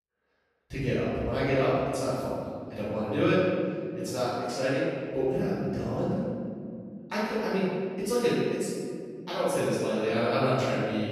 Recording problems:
room echo; strong; dies away in 2.2 s
off-mic speech; far

